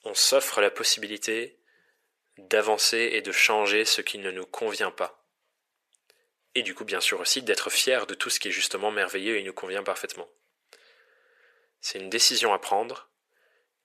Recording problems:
thin; very; fading below 500 Hz

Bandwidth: 14.5 kHz